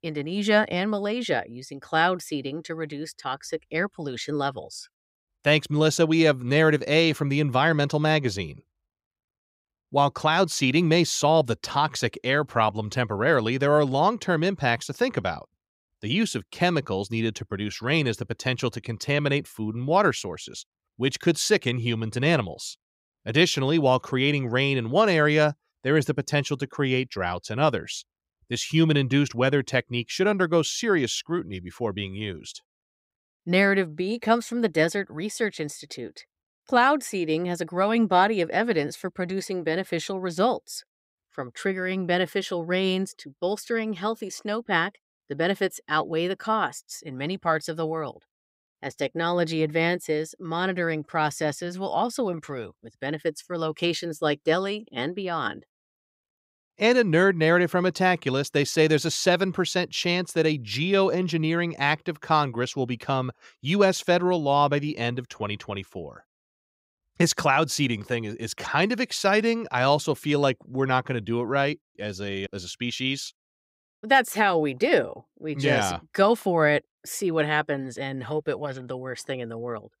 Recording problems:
none

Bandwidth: 15.5 kHz